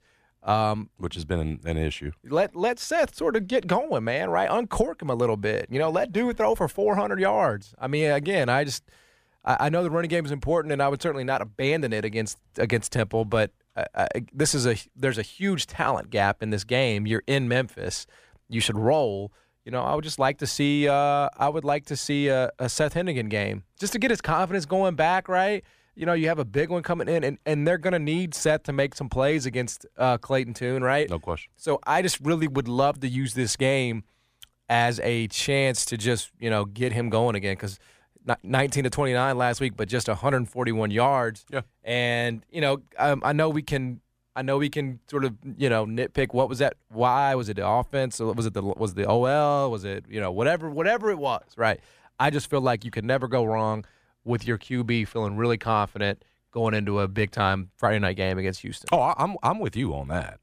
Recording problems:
none

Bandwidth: 15 kHz